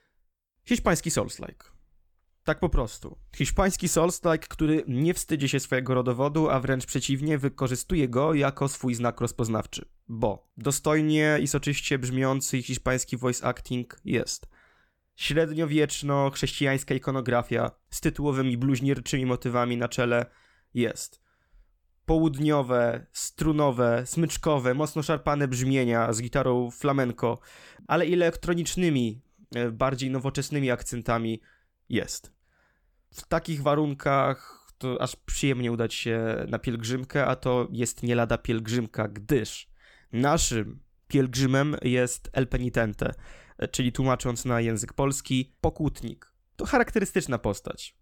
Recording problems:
none

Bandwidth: 18.5 kHz